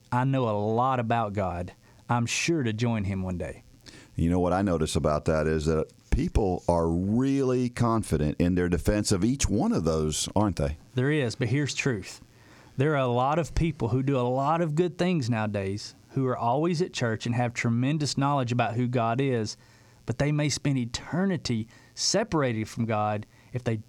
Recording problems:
squashed, flat; somewhat

